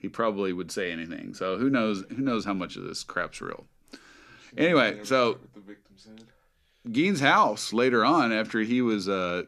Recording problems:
none

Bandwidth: 14.5 kHz